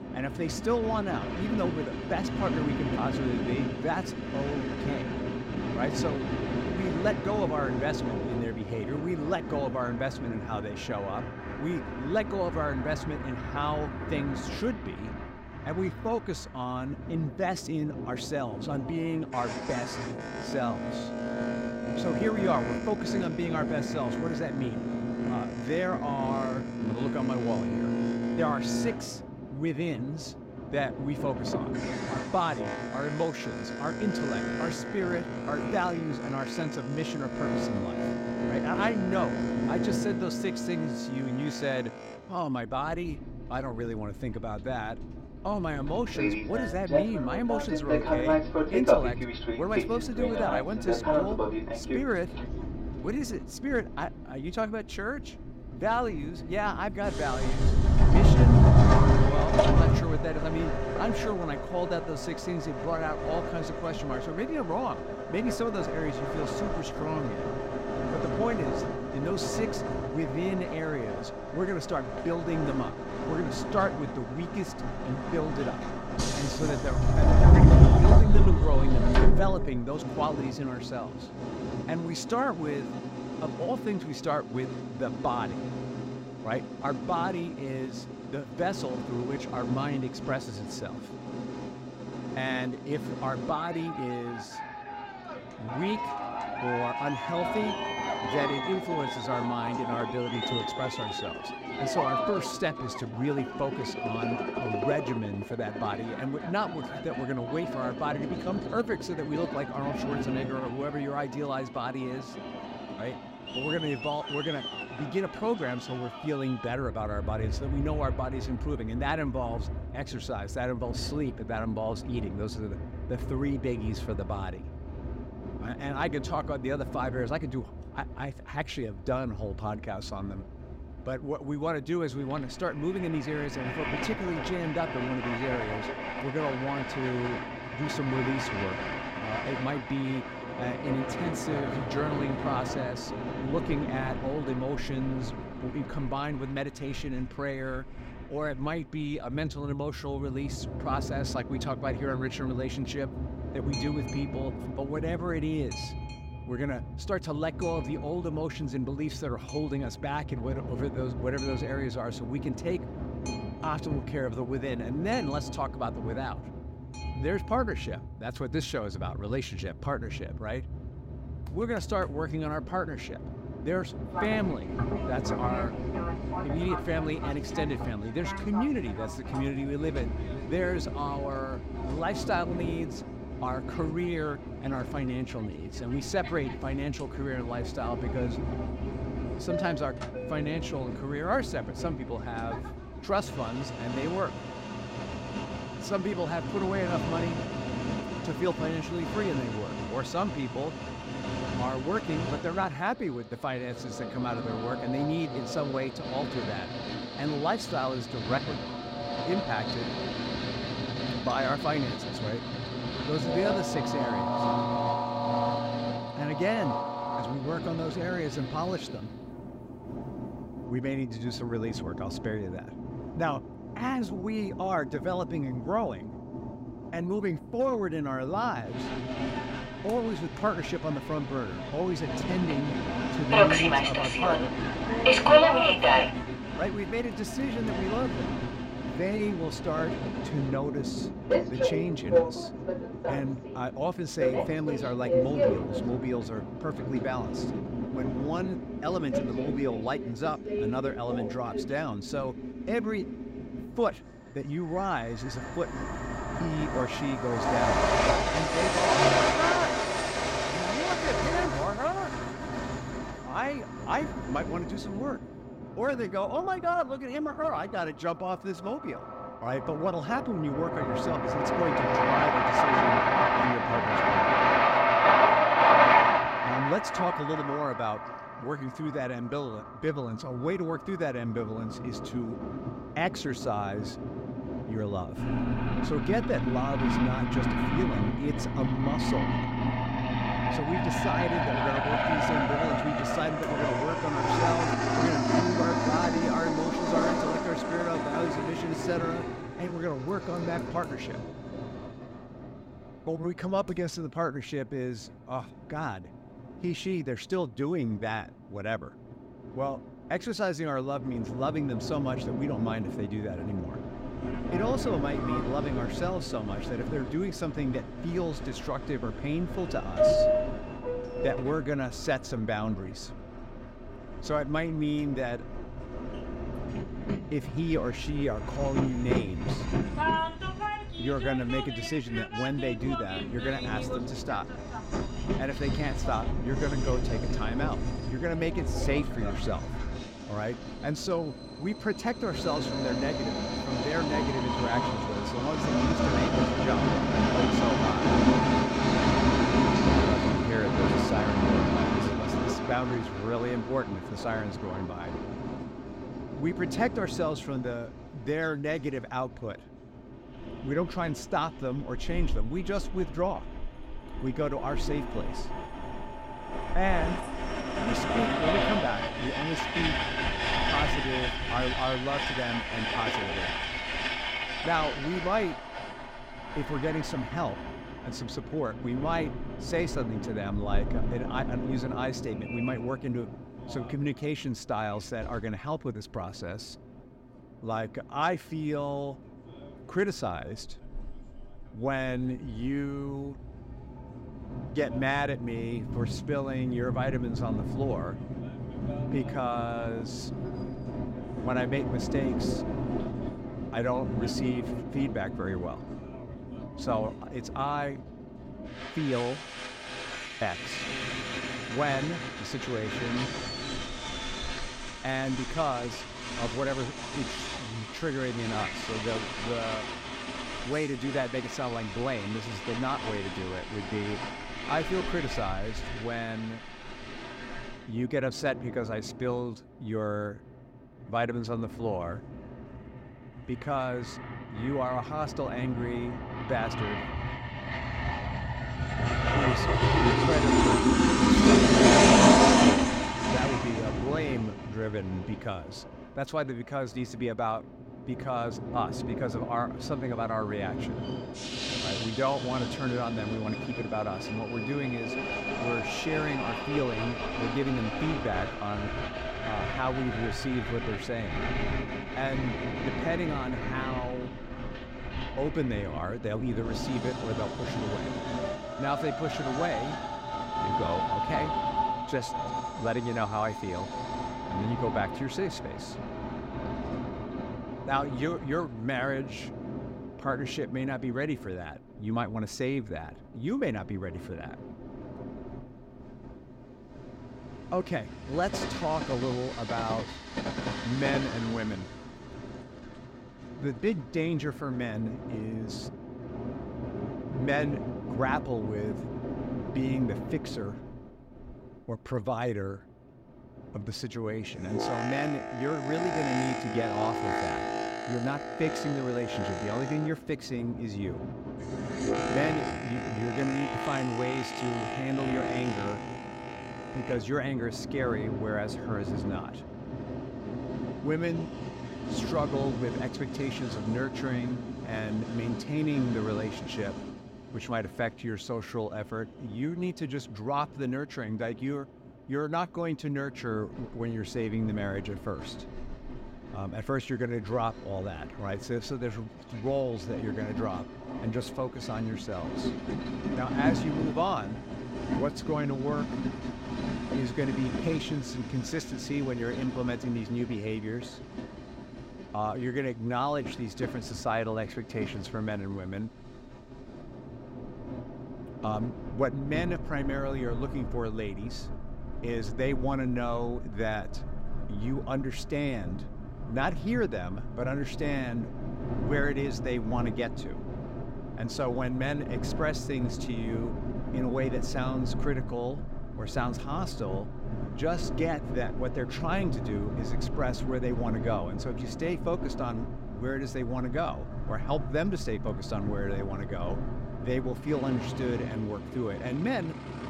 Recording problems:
train or aircraft noise; very loud; throughout; 2 dB above the speech

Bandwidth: 16 kHz